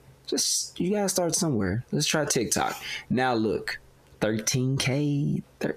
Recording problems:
squashed, flat; heavily

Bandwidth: 14.5 kHz